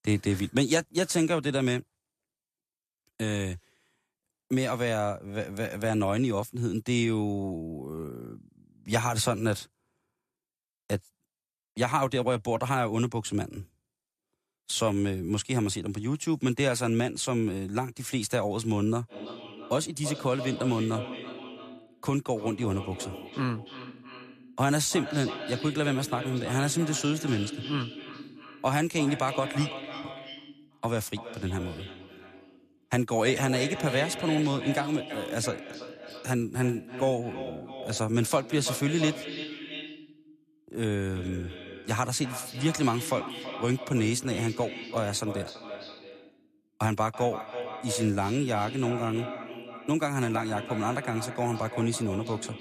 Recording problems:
echo of what is said; strong; from 19 s on; 330 ms later, 10 dB below the speech

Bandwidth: 14.5 kHz